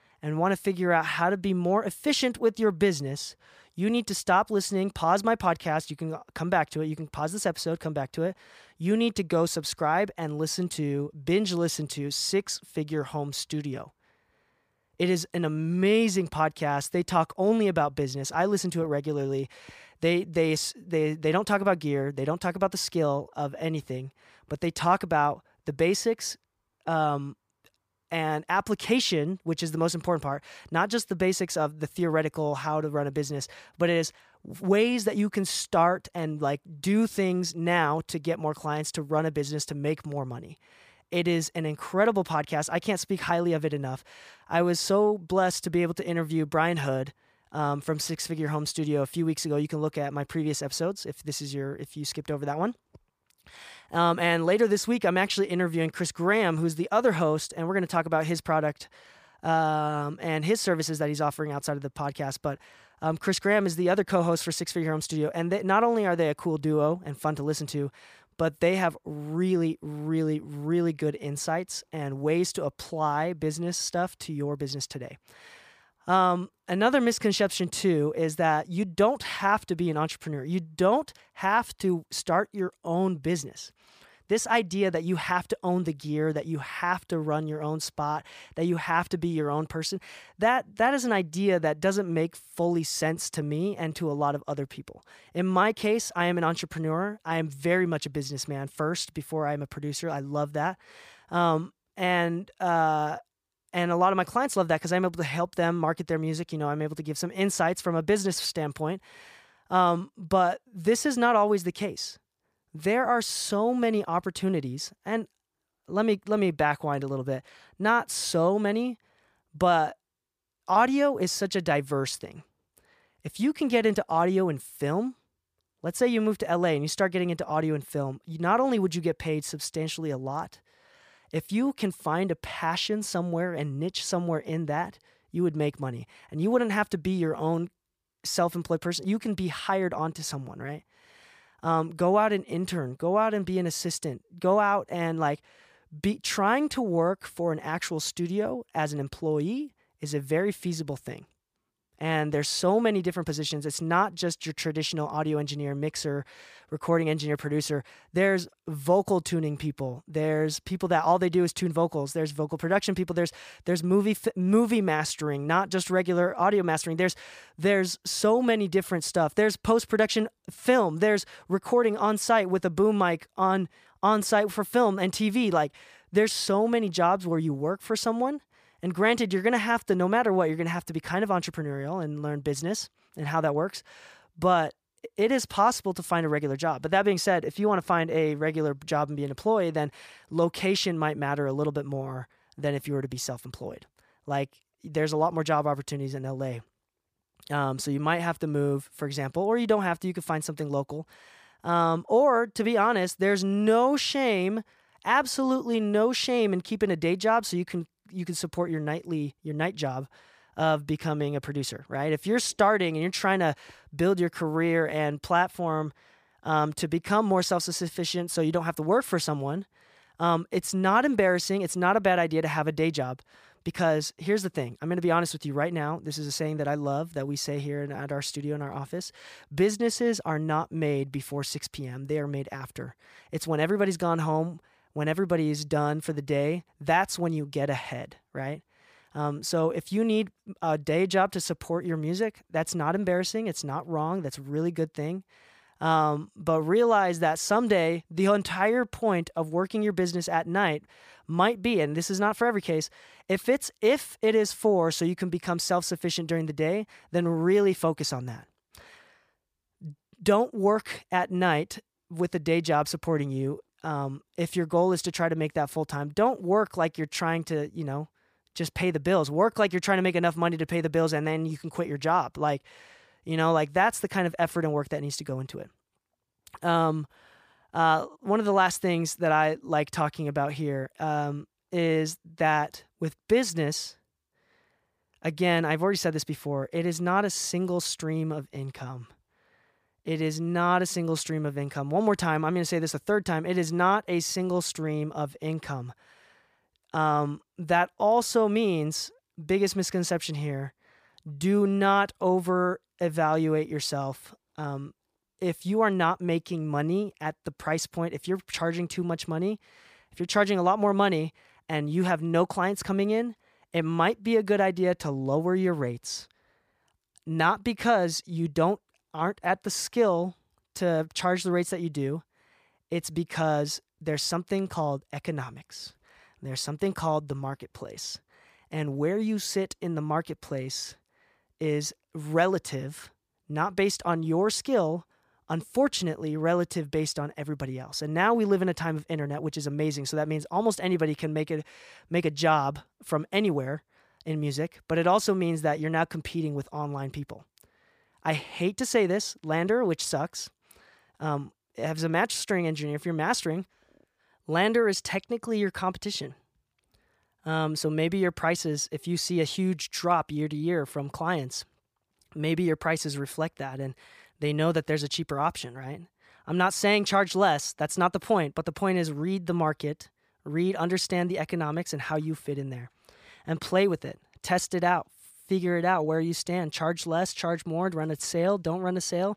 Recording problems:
none

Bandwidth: 15 kHz